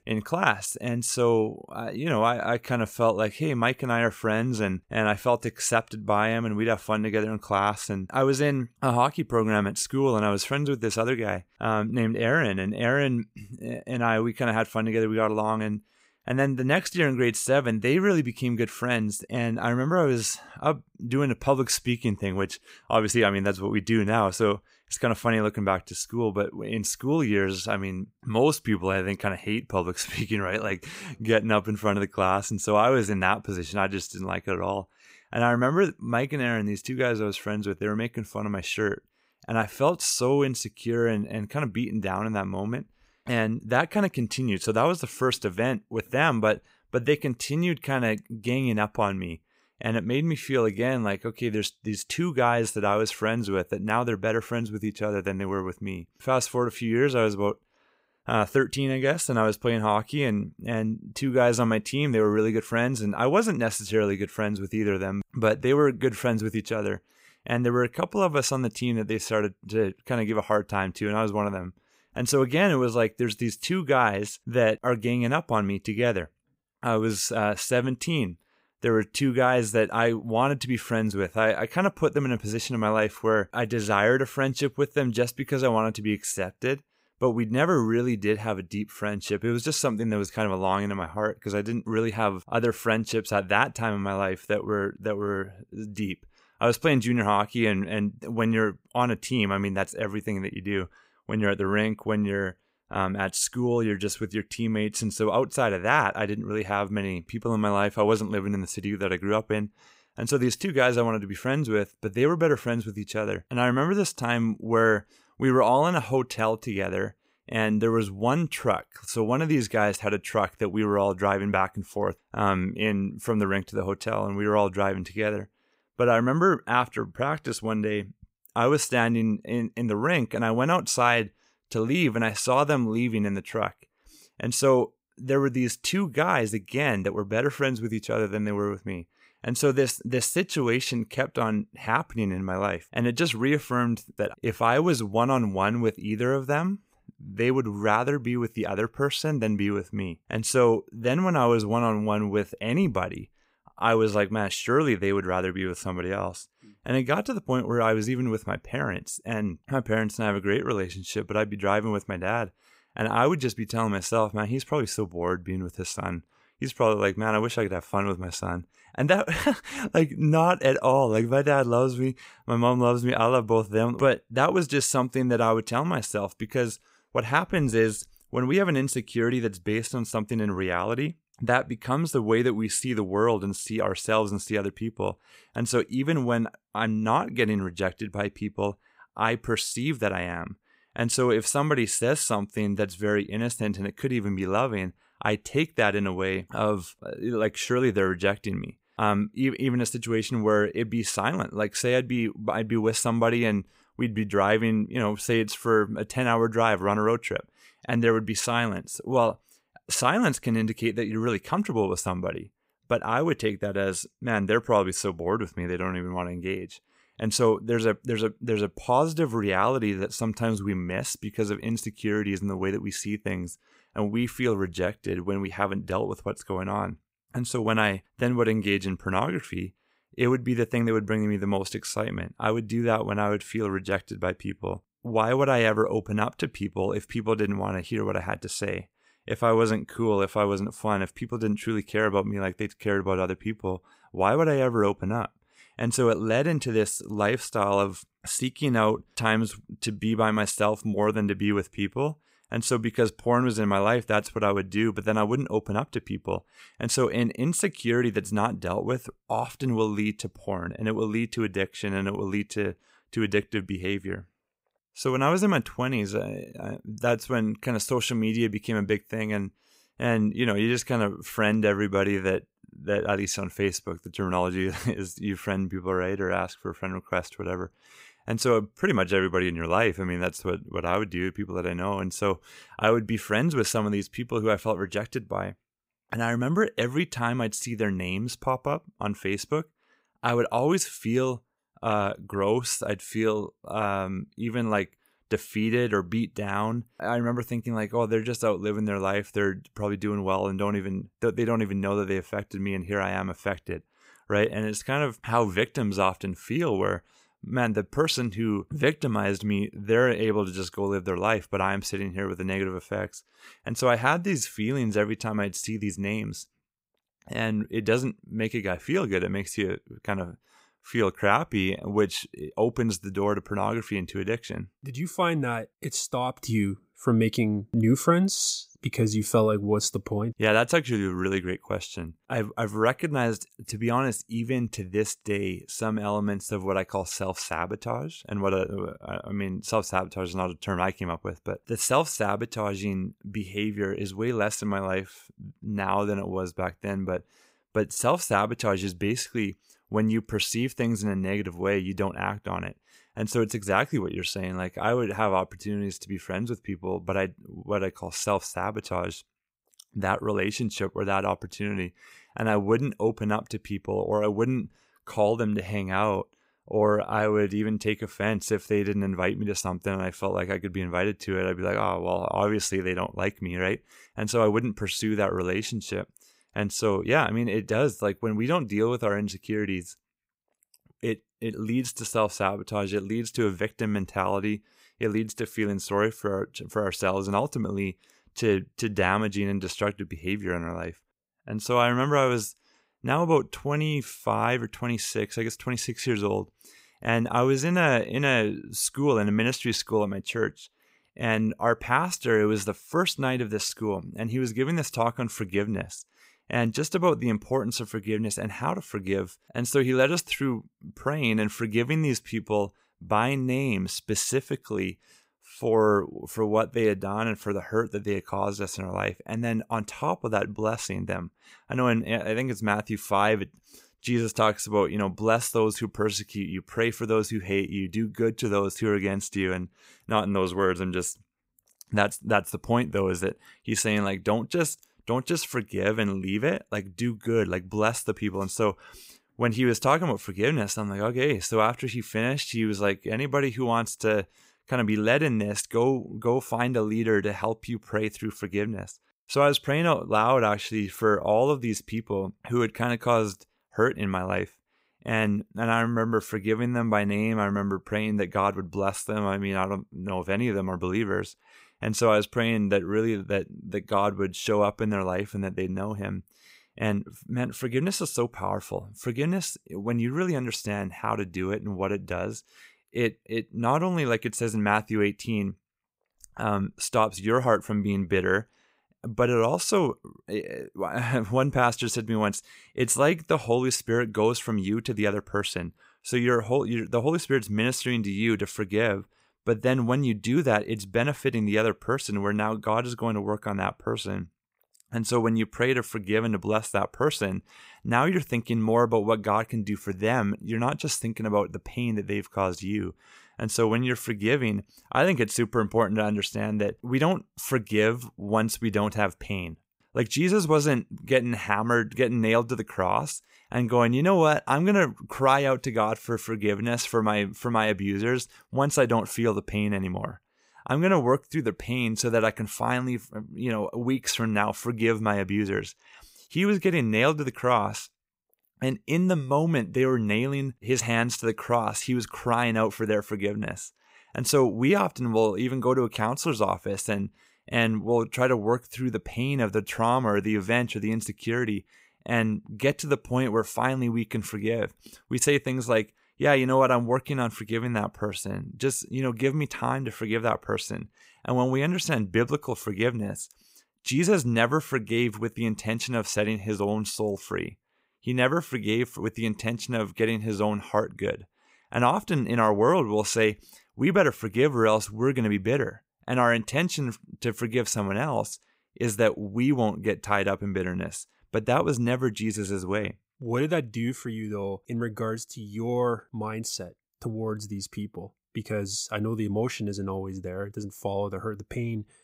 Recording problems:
none

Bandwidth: 15.5 kHz